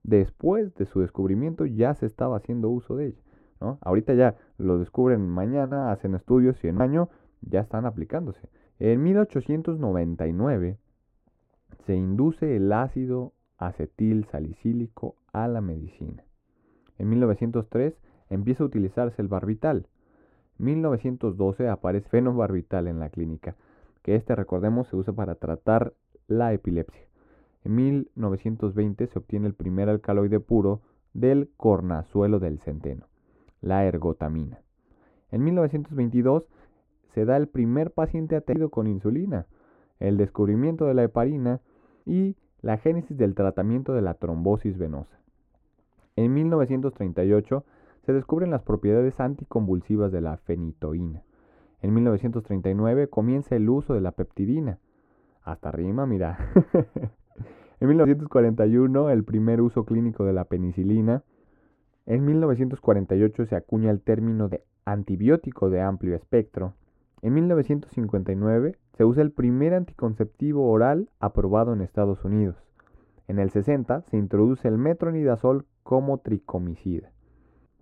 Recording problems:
muffled; very; fading above 2 kHz

